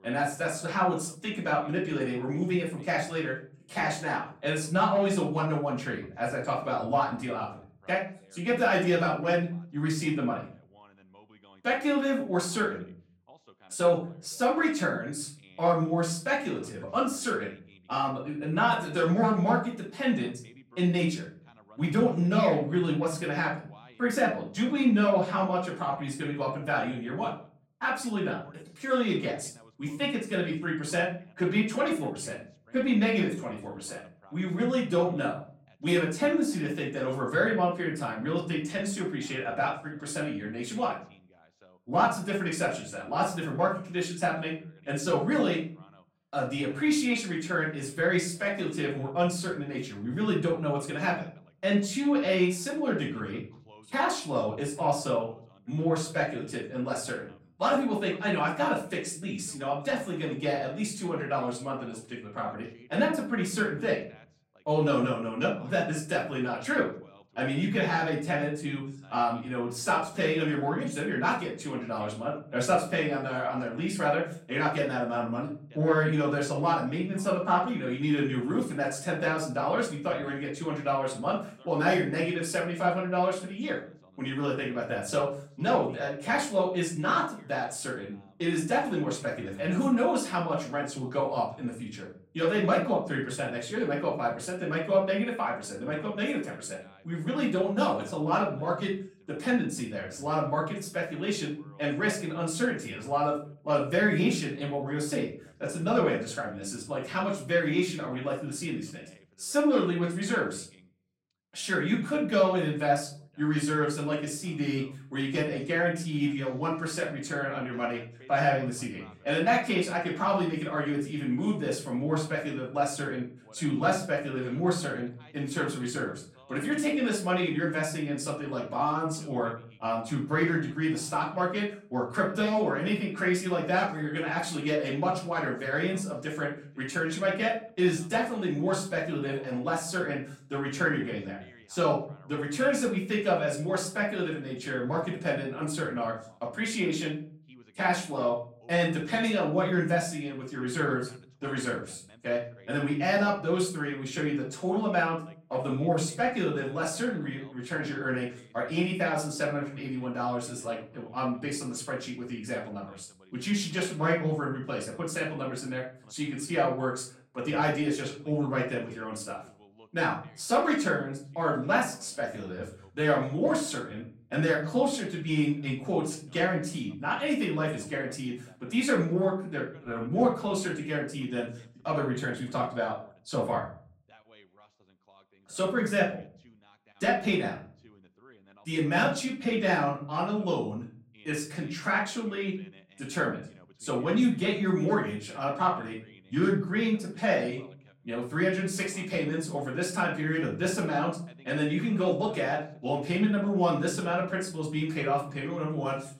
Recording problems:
off-mic speech; far
room echo; slight; dies away in 0.4 s
voice in the background; faint; throughout; 30 dB below the speech

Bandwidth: 16.5 kHz